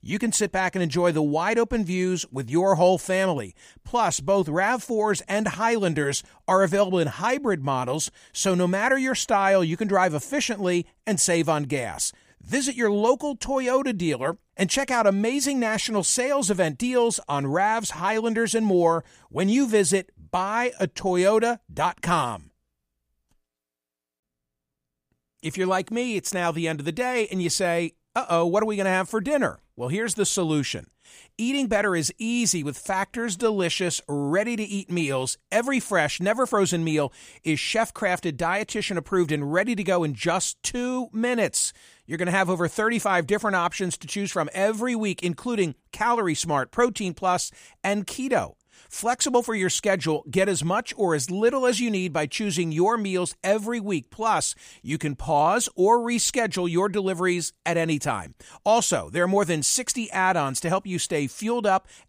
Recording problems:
none

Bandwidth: 15 kHz